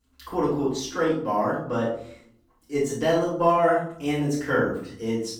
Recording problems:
off-mic speech; far
room echo; noticeable; dies away in 0.5 s

